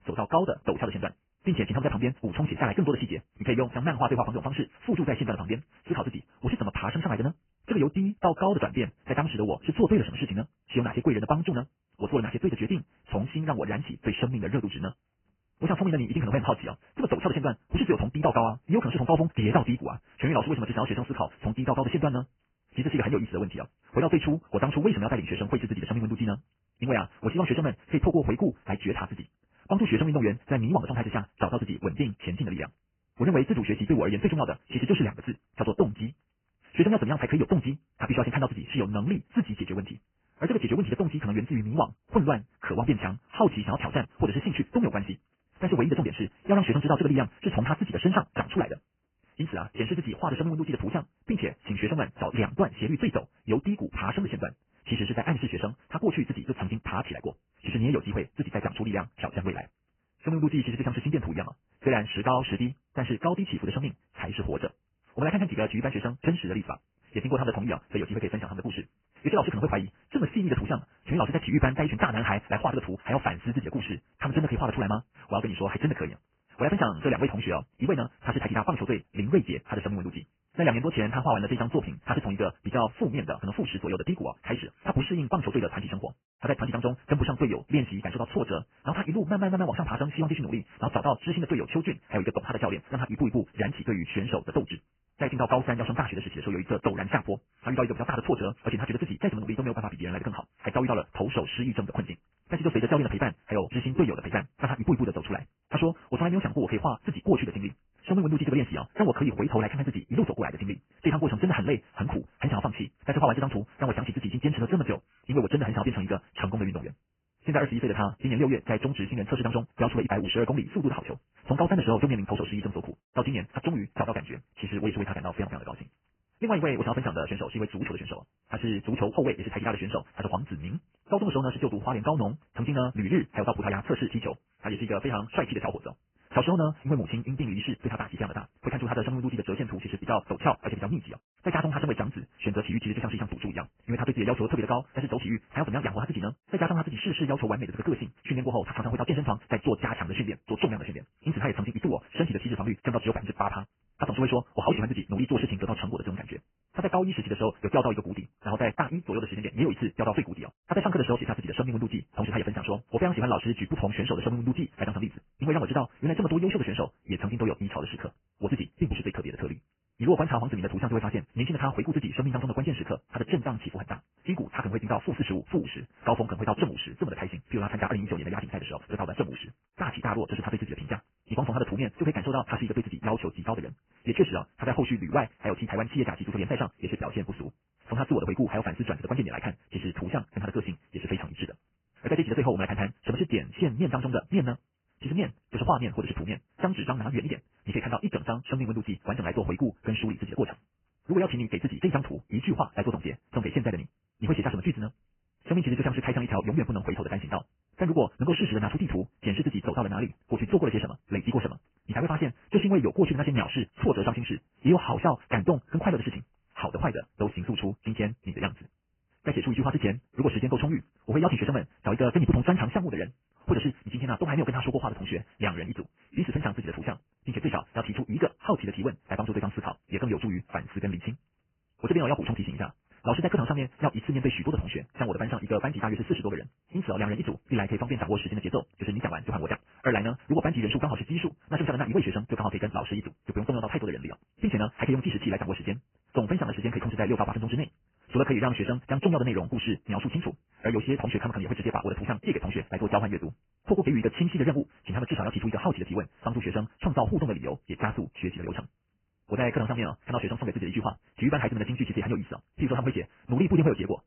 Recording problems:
garbled, watery; badly
high frequencies cut off; severe; nothing above 3 kHz
wrong speed, natural pitch; too fast; 1.8 times normal speed

